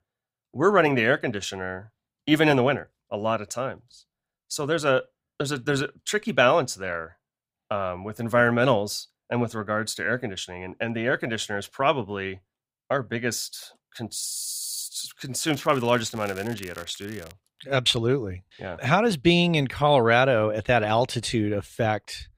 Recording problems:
crackling; faint; from 15 to 17 s; 20 dB below the speech

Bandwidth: 15.5 kHz